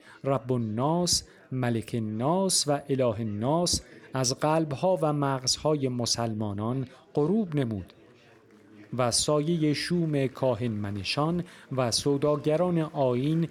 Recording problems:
chatter from many people; faint; throughout; 30 dB below the speech

